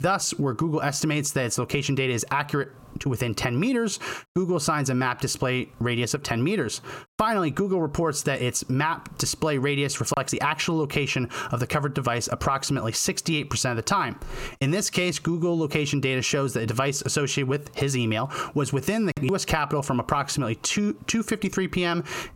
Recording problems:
squashed, flat; heavily

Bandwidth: 16.5 kHz